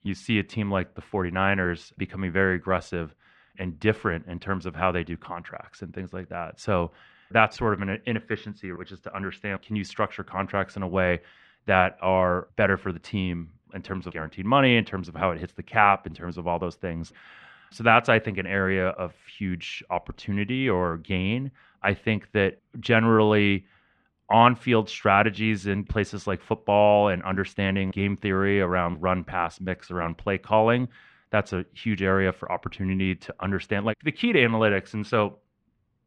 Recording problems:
muffled; slightly; fading above 2.5 kHz

